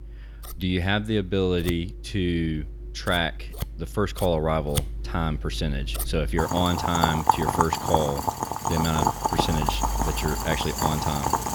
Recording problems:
household noises; loud; throughout; 1 dB below the speech

